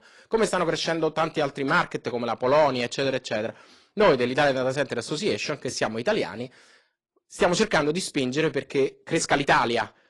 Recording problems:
distortion; slight; 10 dB below the speech
garbled, watery; slightly; nothing above 10.5 kHz

